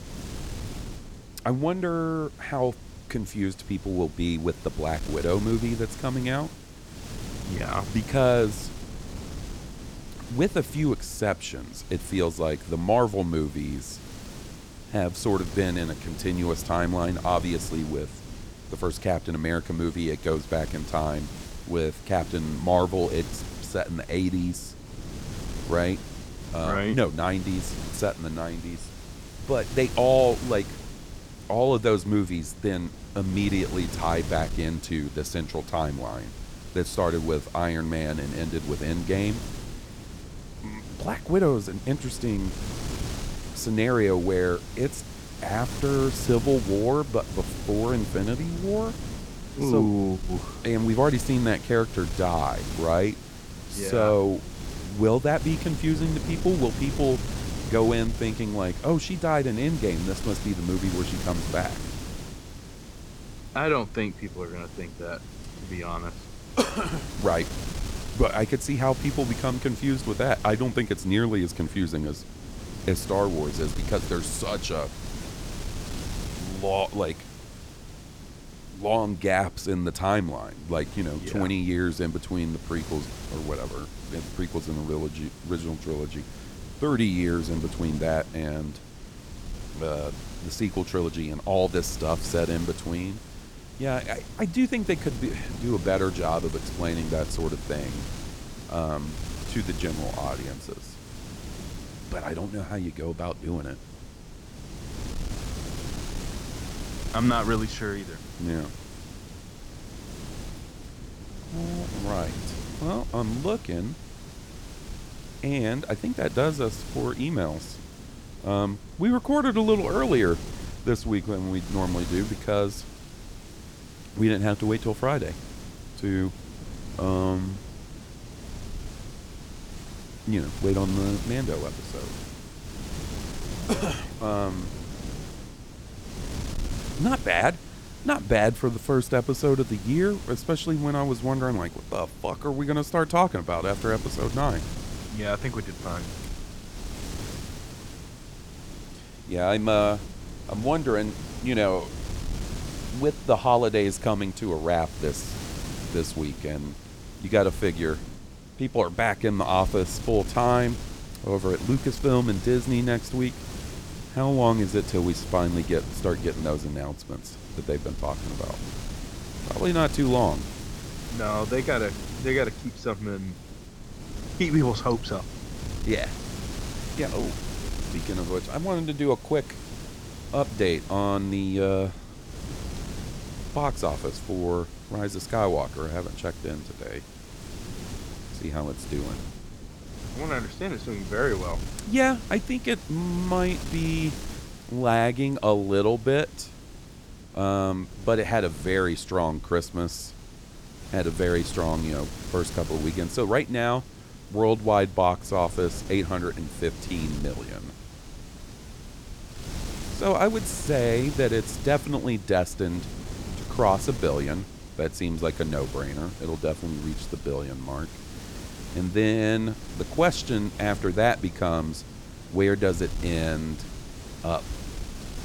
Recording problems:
wind noise on the microphone; occasional gusts; 15 dB below the speech

